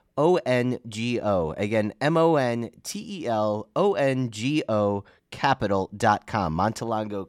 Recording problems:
none

